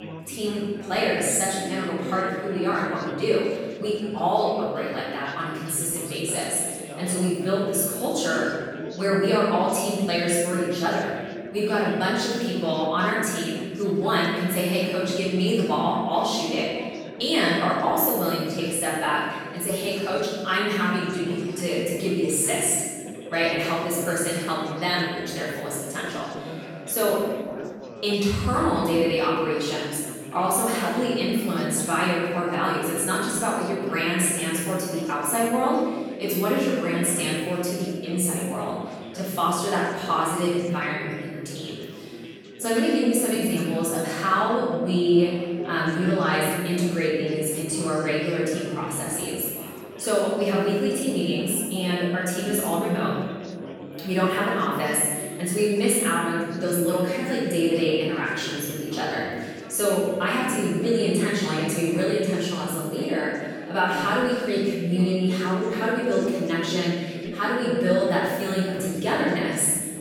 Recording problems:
room echo; strong; dies away in 1.3 s
off-mic speech; far
background chatter; noticeable; throughout; 4 voices, 15 dB below the speech

